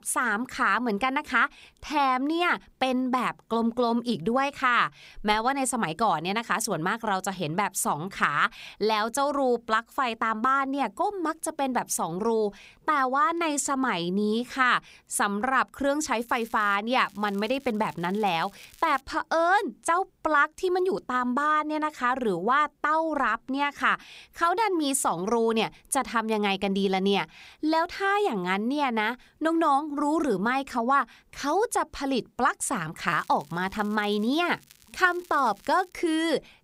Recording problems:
crackling; faint; at 16 s, from 17 to 19 s and from 33 to 36 s; 25 dB below the speech

